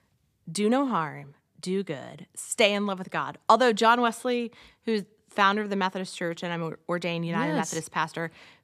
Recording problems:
none

